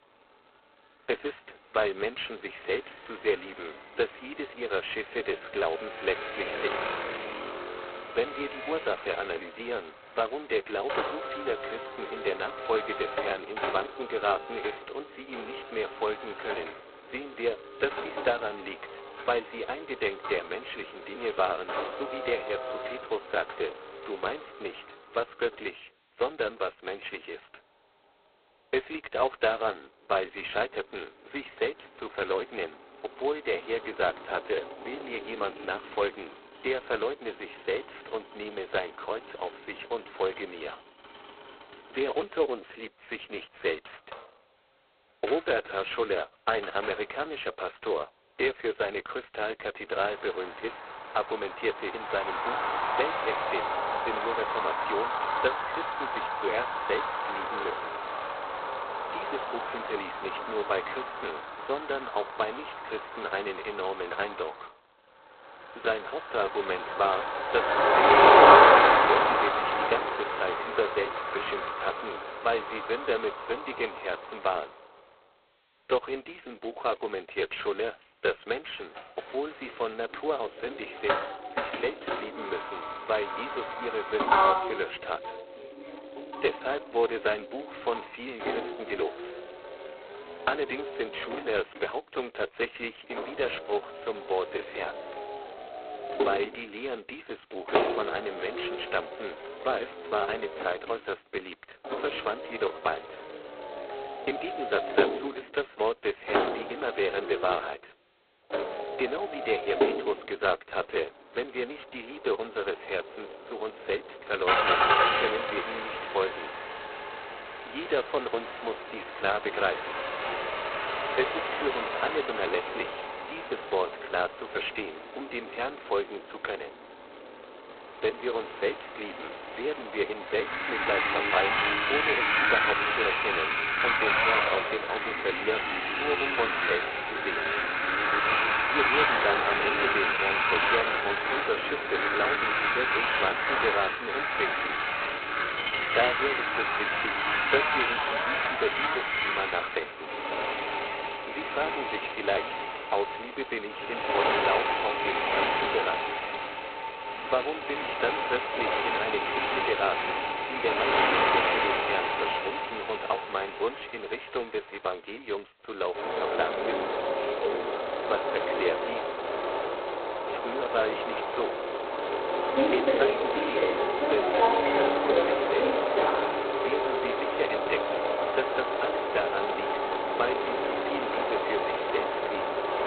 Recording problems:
phone-call audio; poor line; nothing above 4 kHz
traffic noise; very loud; throughout; 5 dB above the speech

